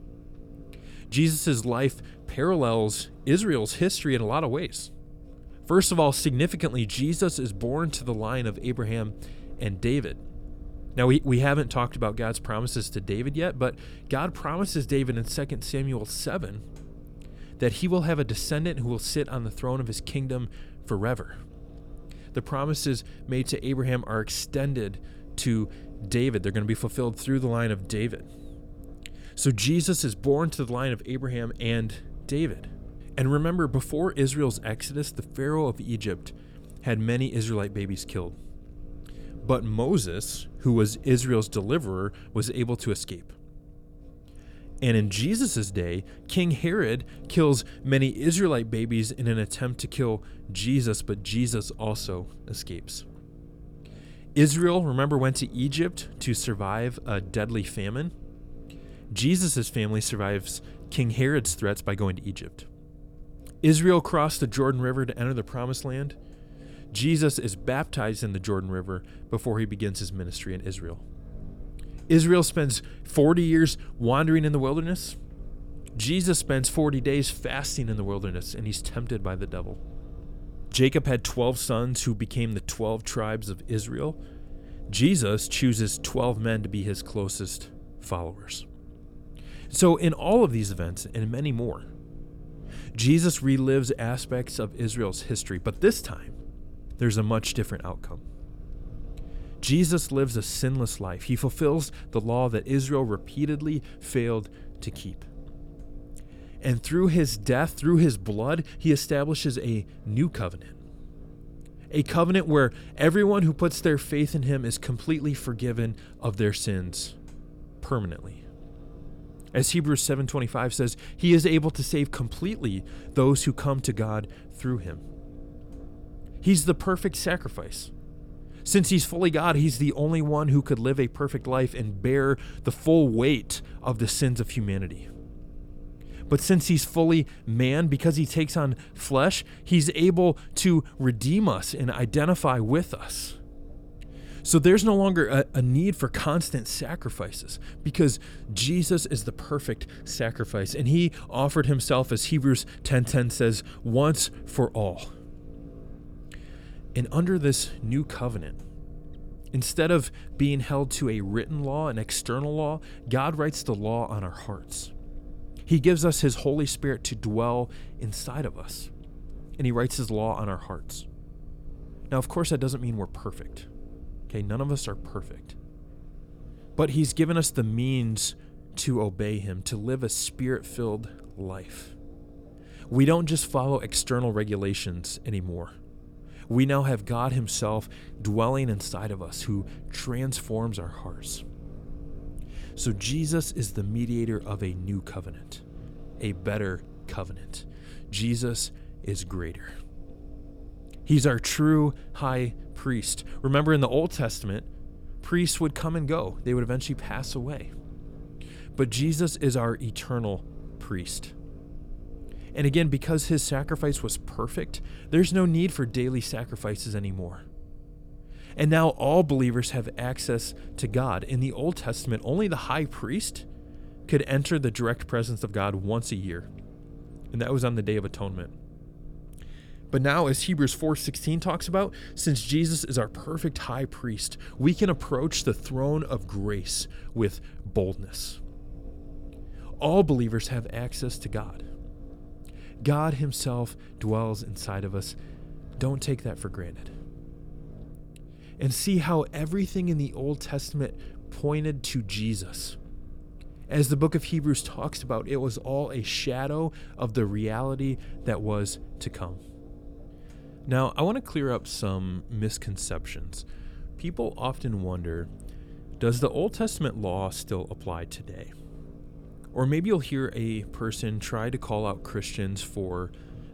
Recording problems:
low rumble; faint; throughout; 25 dB below the speech

